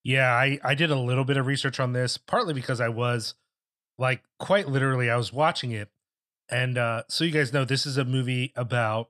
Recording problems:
none

